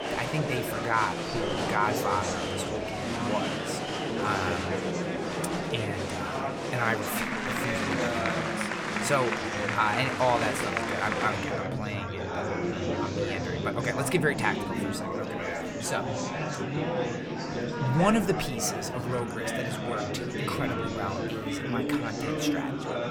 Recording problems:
murmuring crowd; very loud; throughout; 1 dB above the speech

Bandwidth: 18 kHz